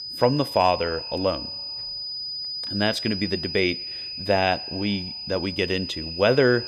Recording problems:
echo of what is said; faint; throughout; 120 ms later, 25 dB below the speech
high-pitched whine; loud; throughout; 5 kHz, 6 dB below the speech

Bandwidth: 15 kHz